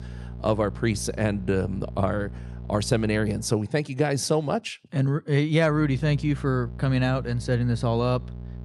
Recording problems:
electrical hum; faint; until 3.5 s and from 5.5 s on; 60 Hz, 20 dB below the speech

